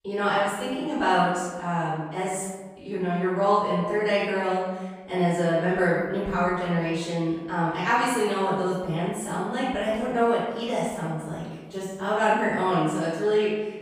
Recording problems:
room echo; strong; dies away in 1.2 s
off-mic speech; far

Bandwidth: 15 kHz